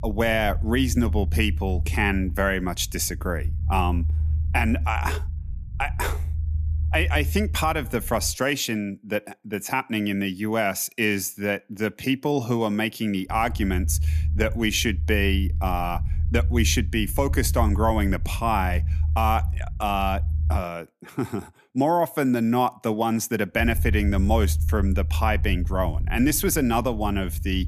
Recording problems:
low rumble; noticeable; until 8.5 s, from 13 to 21 s and from 24 s on; 20 dB below the speech

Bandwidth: 14.5 kHz